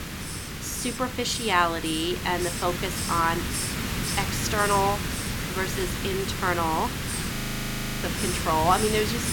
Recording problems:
hiss; loud; throughout; 3 dB below the speech
audio freezing; at 7.5 s for 0.5 s

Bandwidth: 17 kHz